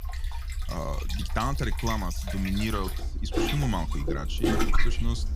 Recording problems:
distortion; slight; 15 dB below the speech
rain or running water; loud; throughout; as loud as the speech
low rumble; faint; throughout; 20 dB below the speech

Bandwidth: 15.5 kHz